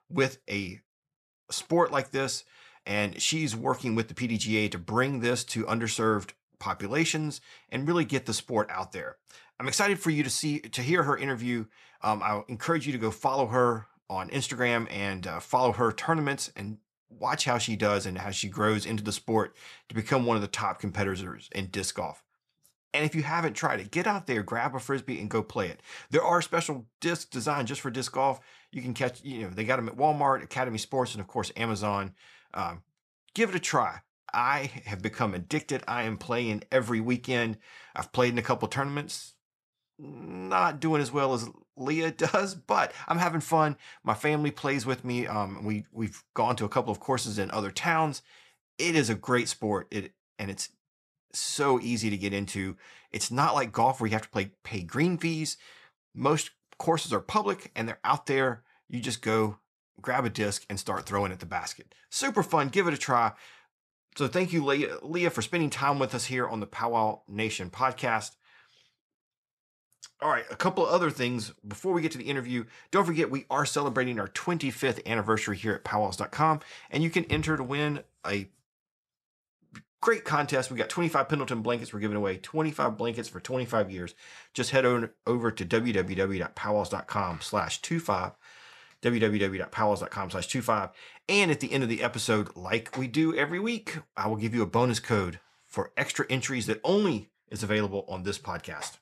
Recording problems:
none

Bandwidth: 13.5 kHz